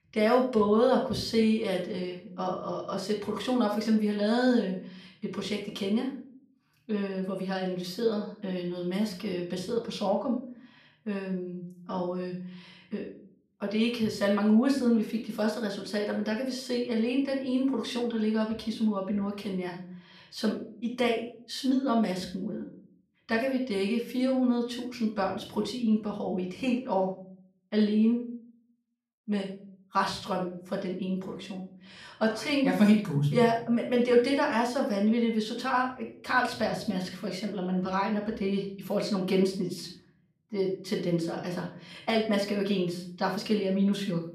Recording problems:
off-mic speech; far
room echo; slight; dies away in 0.4 s

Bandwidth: 14.5 kHz